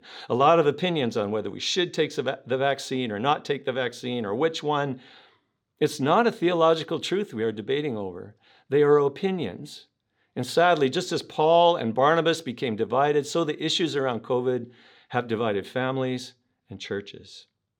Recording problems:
none

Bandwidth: 18.5 kHz